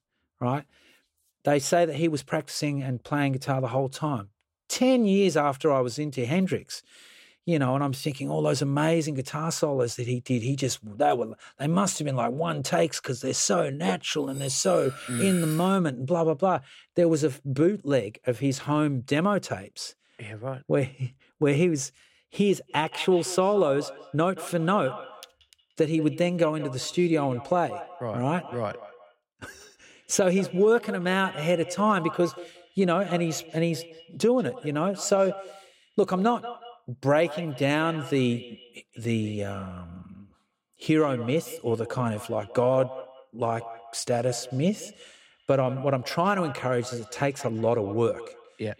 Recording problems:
echo of what is said; noticeable; from 23 s on; 180 ms later, 15 dB below the speech
clattering dishes; noticeable; from 14 to 16 s; peak 6 dB below the speech

